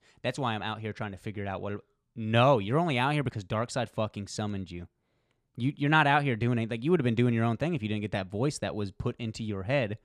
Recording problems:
none

